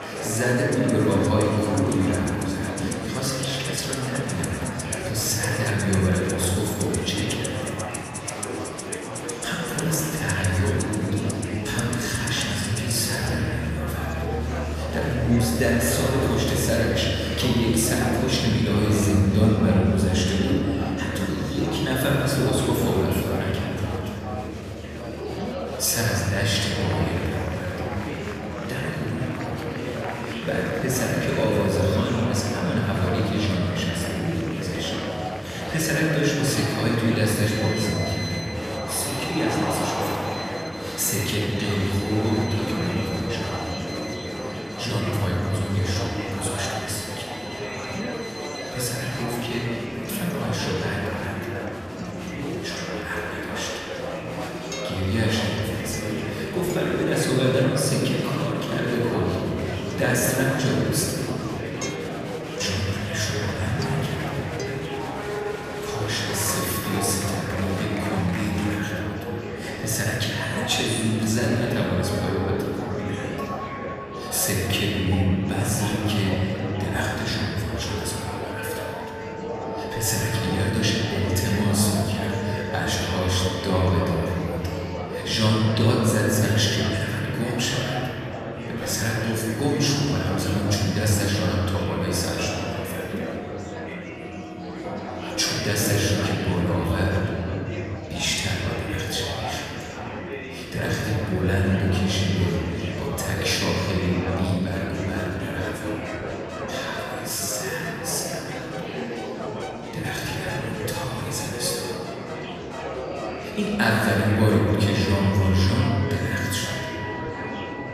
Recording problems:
off-mic speech; far
room echo; noticeable; dies away in 3 s
murmuring crowd; loud; throughout; 7 dB below the speech
background music; noticeable; throughout; 15 dB below the speech

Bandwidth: 14.5 kHz